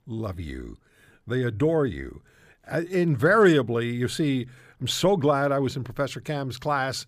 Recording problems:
none

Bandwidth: 15 kHz